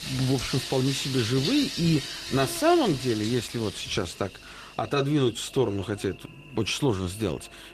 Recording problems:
garbled, watery; slightly; nothing above 14 kHz
rain or running water; loud; throughout; 6 dB below the speech
electrical hum; noticeable; throughout; 50 Hz, 15 dB below the speech

